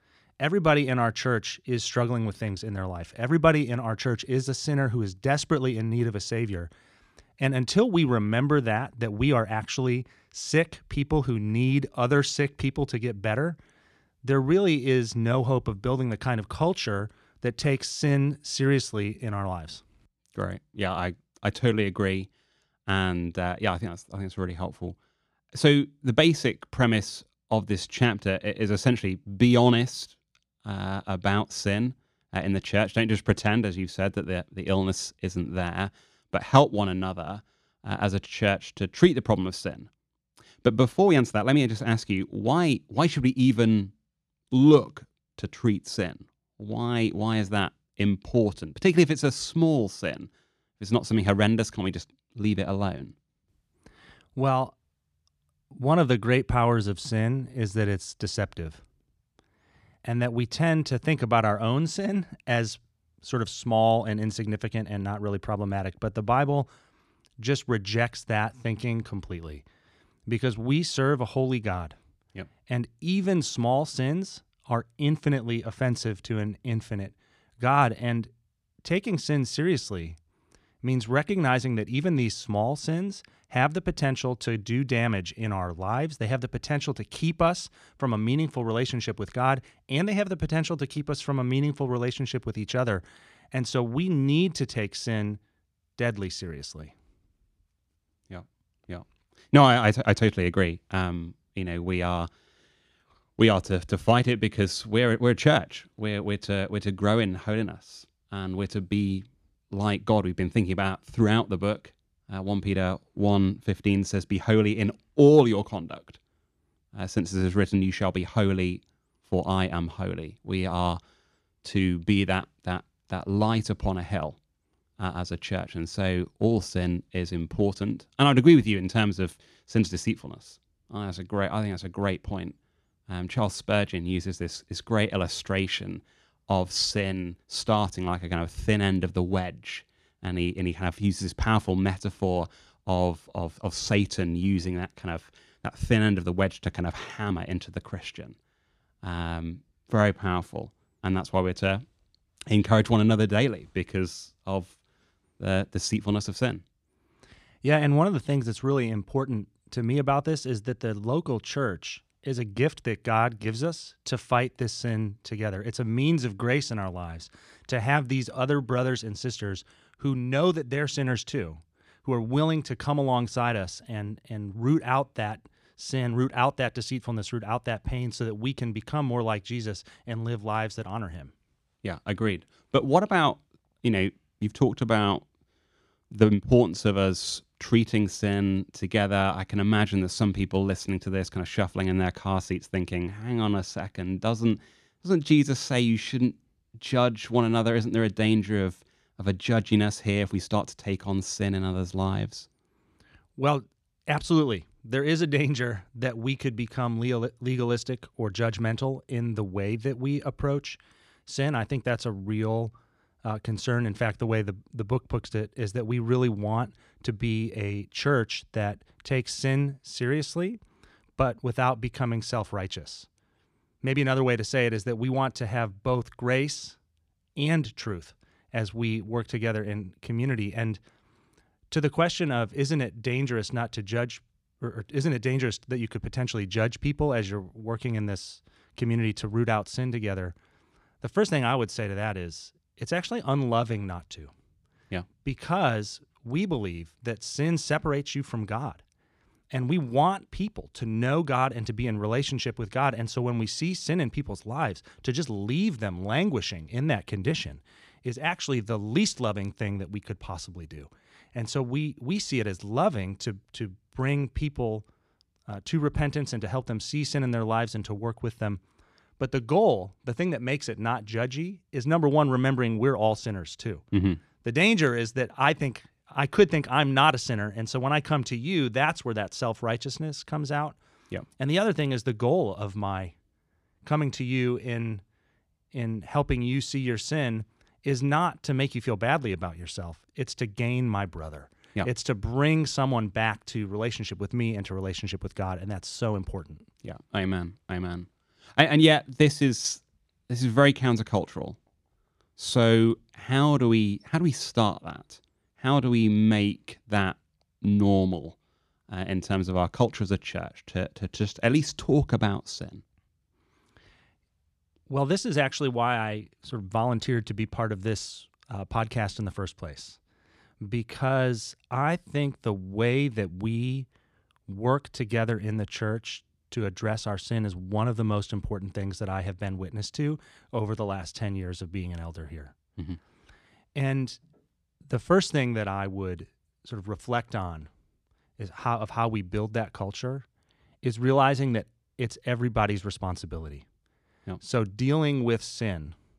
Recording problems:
none

